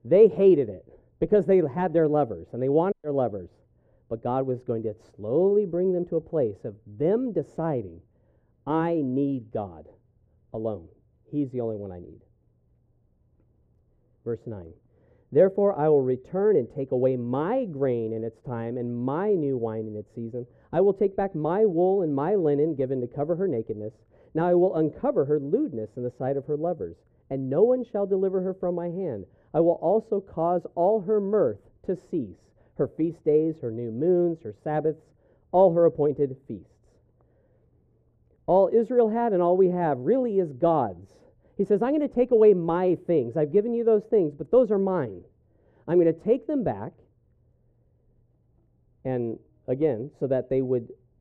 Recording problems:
muffled; very; fading above 1.5 kHz

